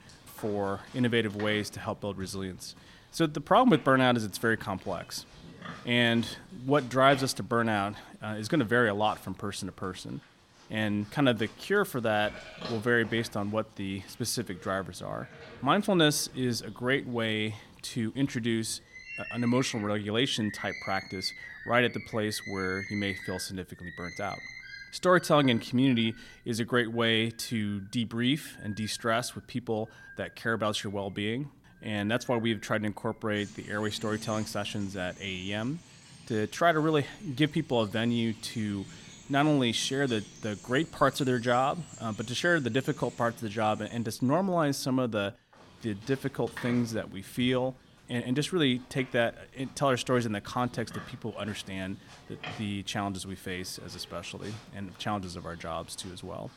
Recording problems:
animal sounds; noticeable; throughout; 15 dB below the speech

